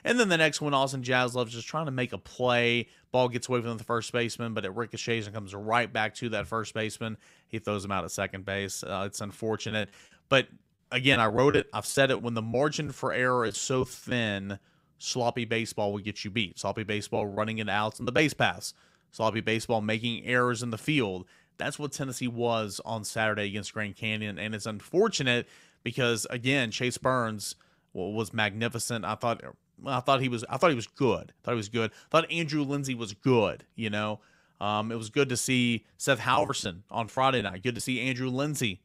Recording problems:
choppy; very; from 9.5 to 14 s, from 17 to 18 s and from 36 to 38 s; 8% of the speech affected

